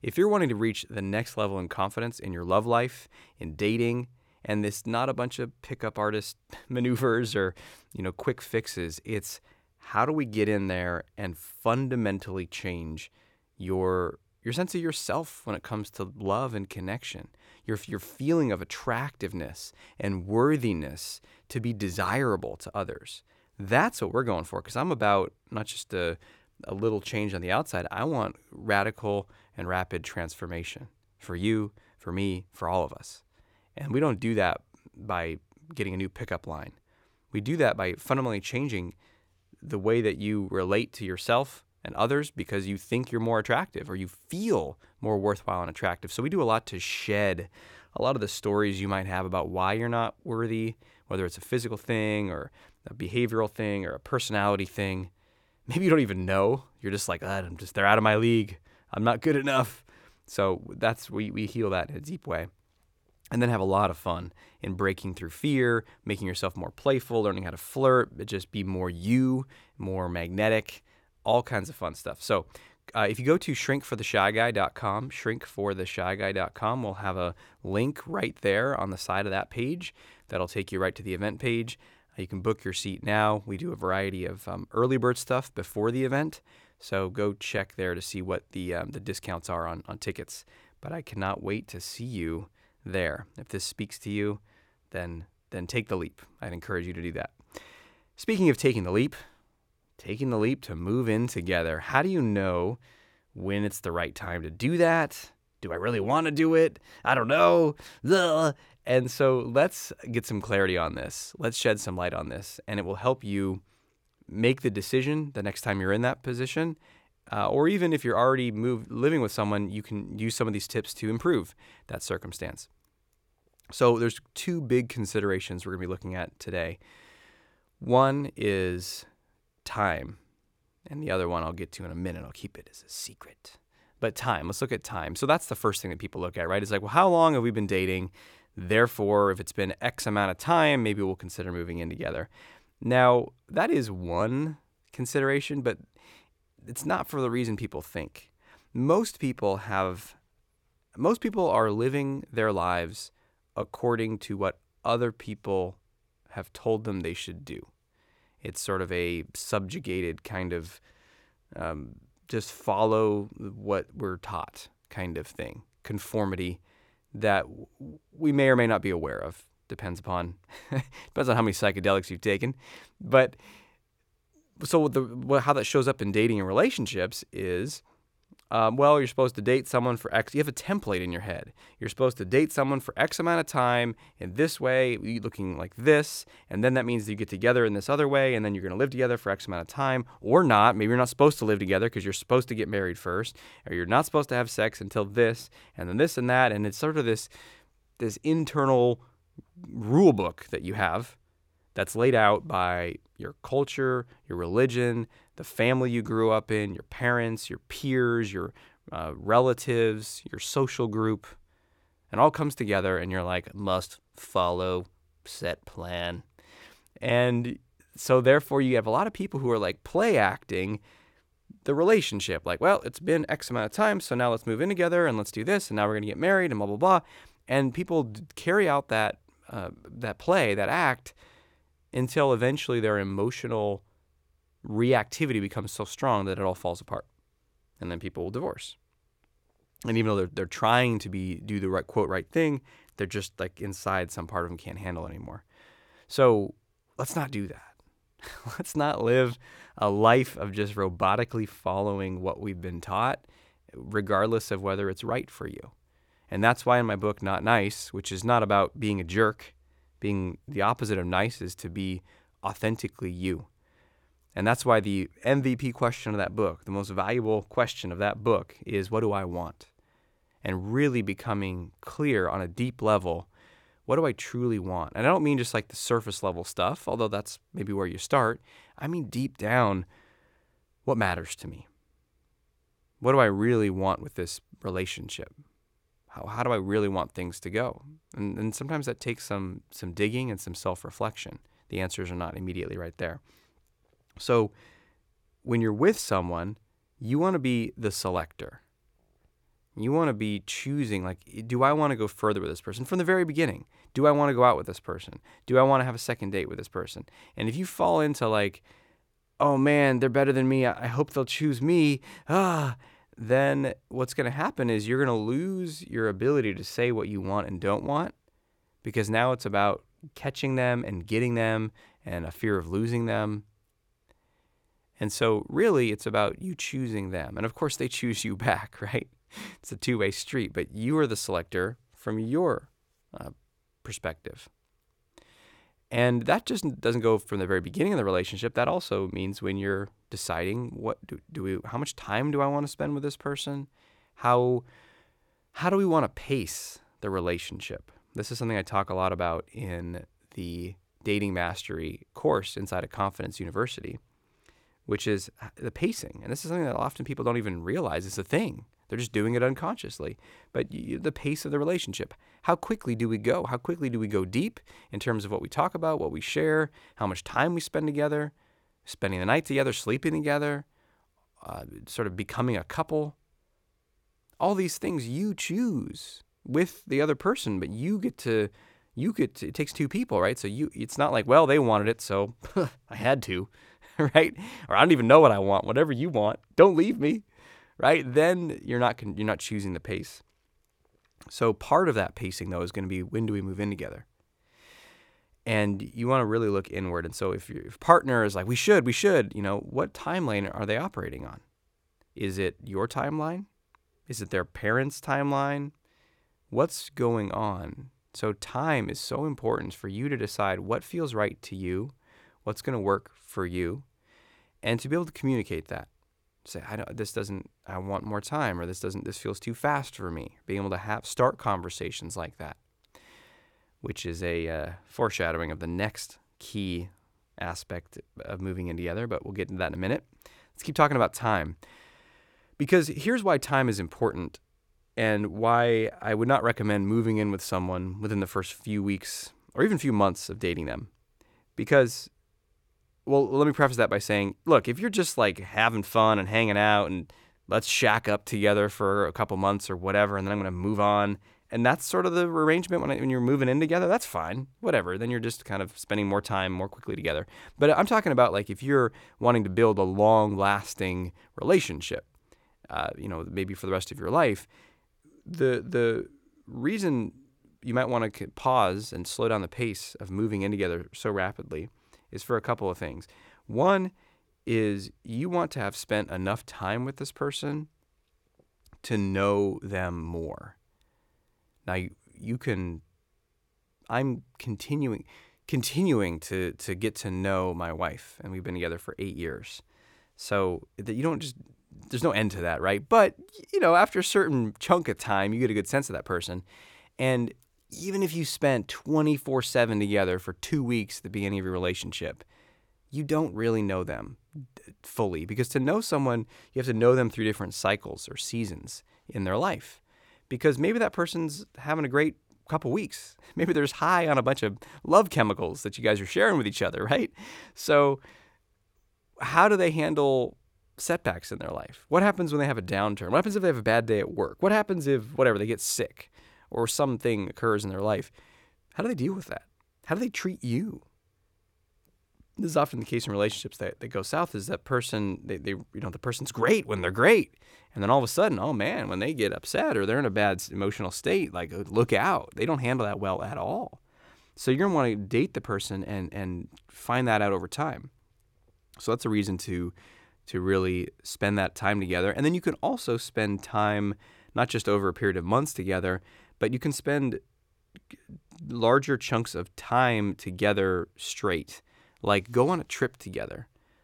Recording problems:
none

